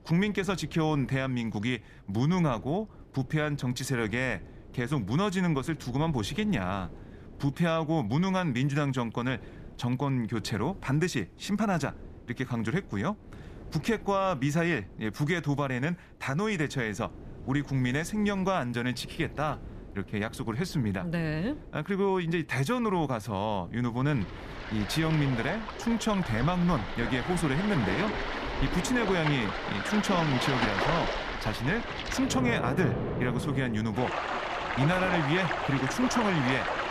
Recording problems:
rain or running water; loud; from 25 s on; 3 dB below the speech
wind noise on the microphone; occasional gusts; 20 dB below the speech

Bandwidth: 14.5 kHz